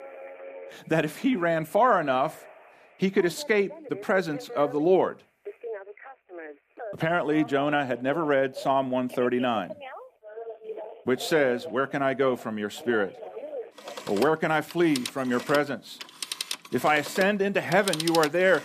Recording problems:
alarms or sirens; noticeable; throughout; 15 dB below the speech

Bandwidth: 14.5 kHz